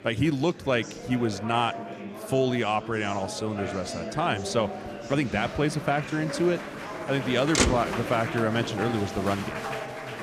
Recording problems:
traffic noise; loud; from 4.5 s on; 4 dB below the speech
murmuring crowd; loud; throughout; 8 dB below the speech

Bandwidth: 14.5 kHz